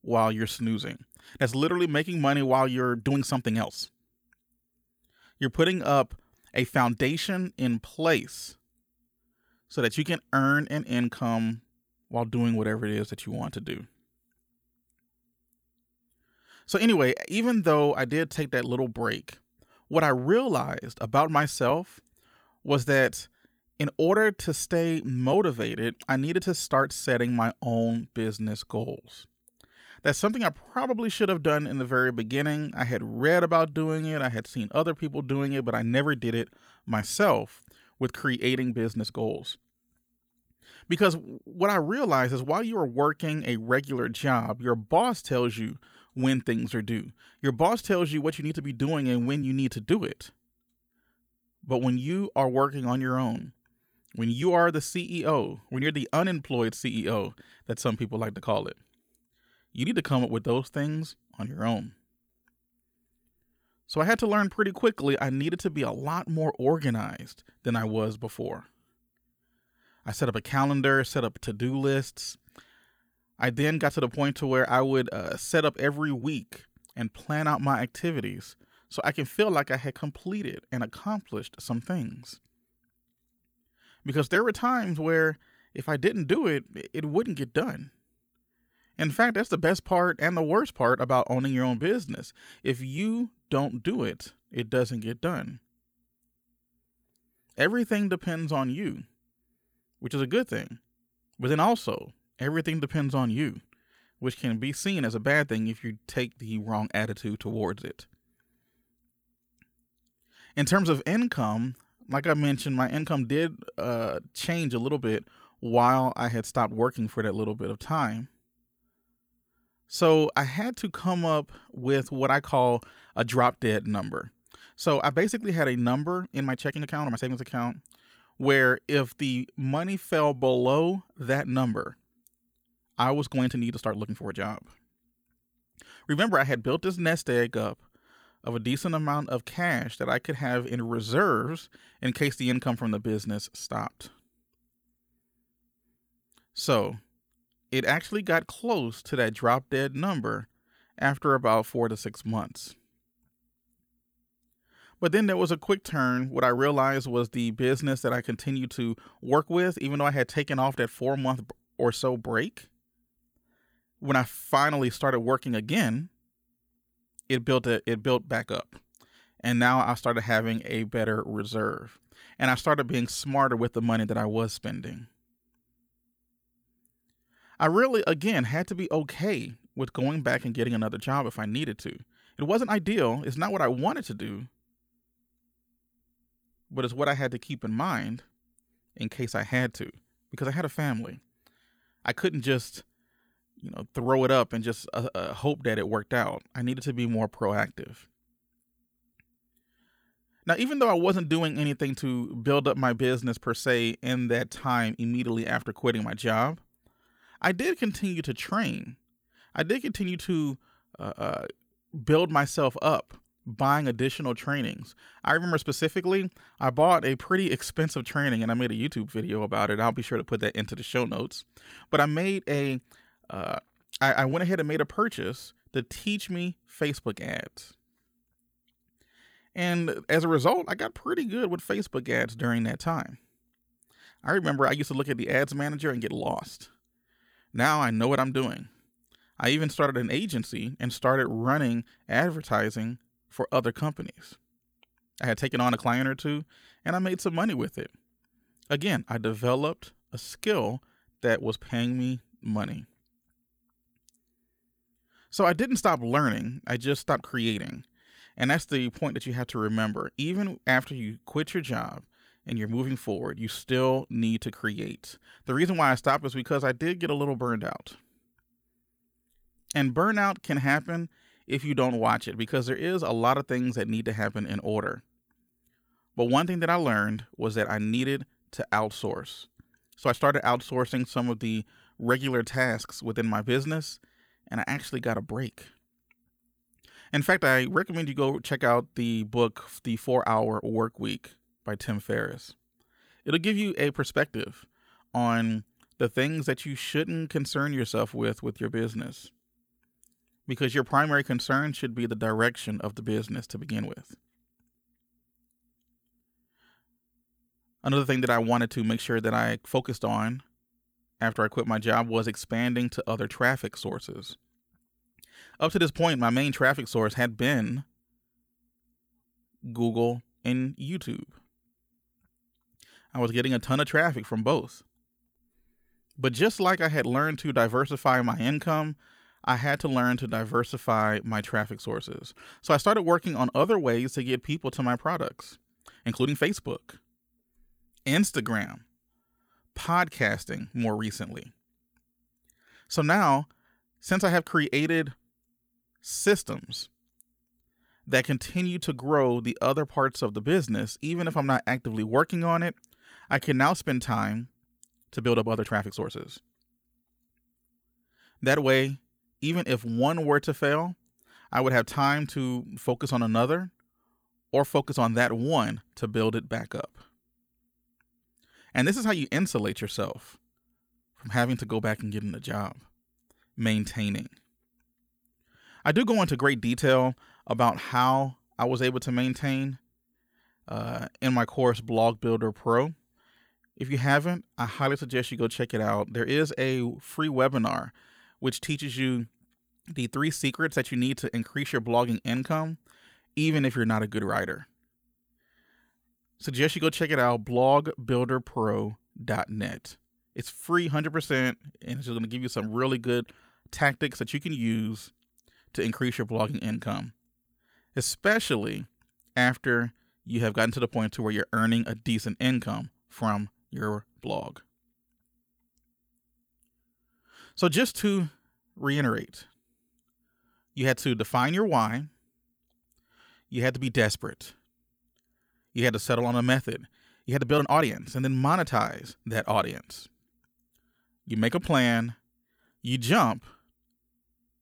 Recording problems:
uneven, jittery; strongly; from 3 s to 7:08

